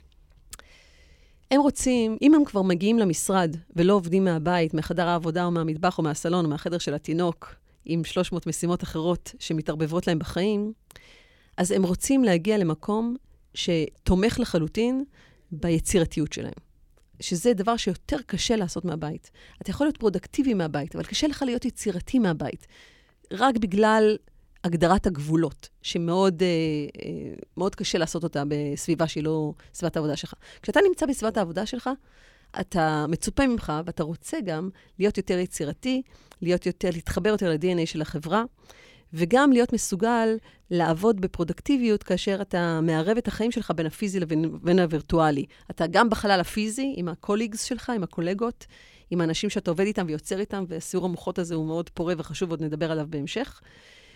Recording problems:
none

